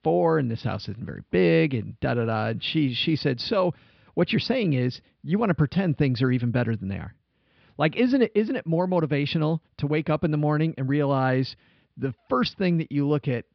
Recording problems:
high frequencies cut off; noticeable; nothing above 5.5 kHz
muffled; very slightly; fading above 3.5 kHz

